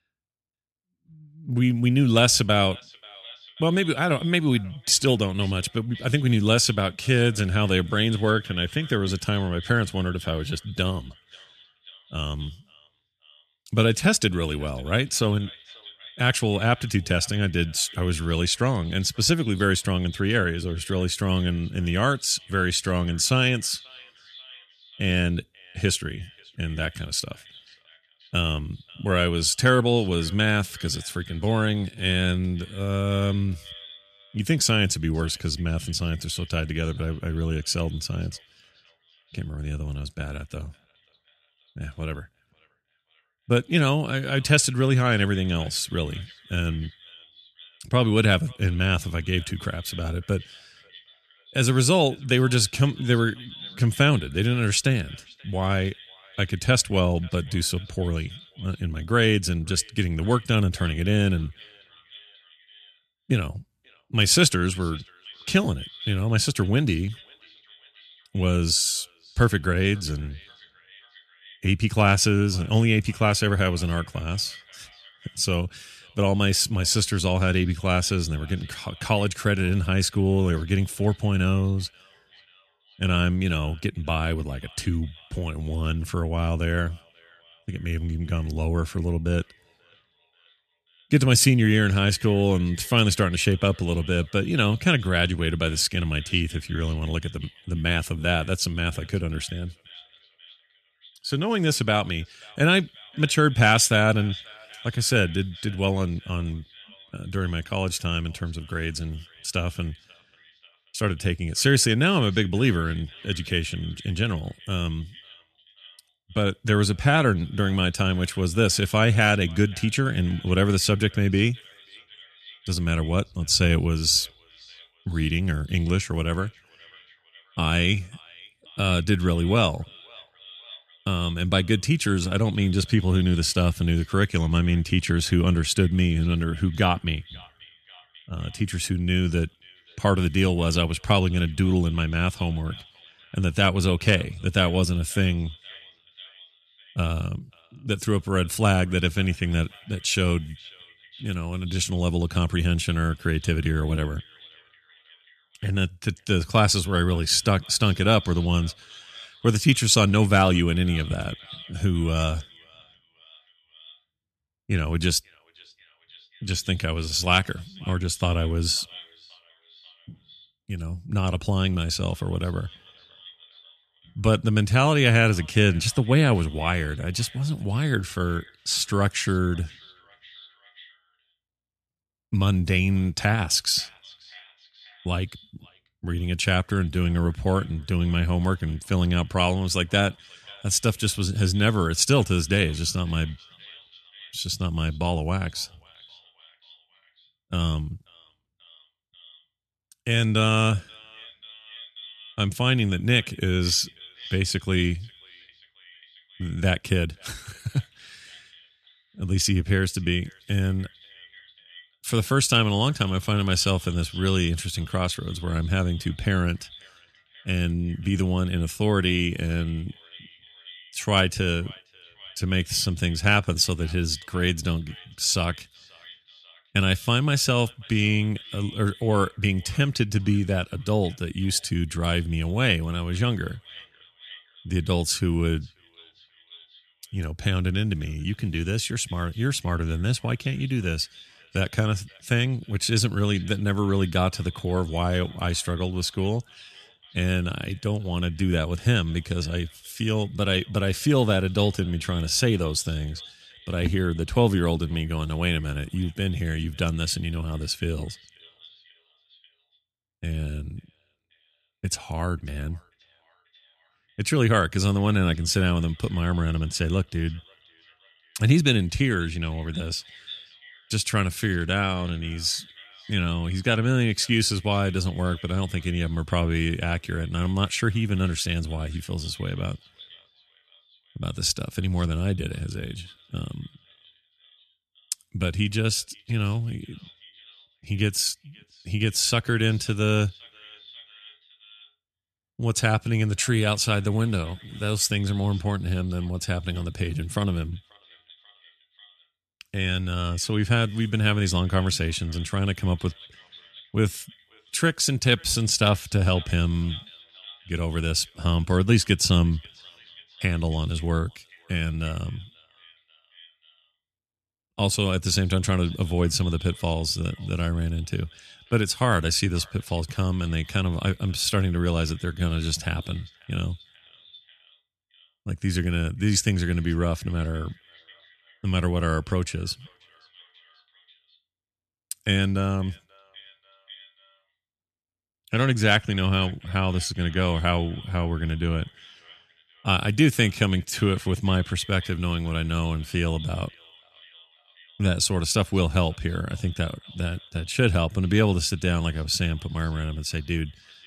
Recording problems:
echo of what is said; faint; throughout; 540 ms later, 20 dB below the speech

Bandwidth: 13.5 kHz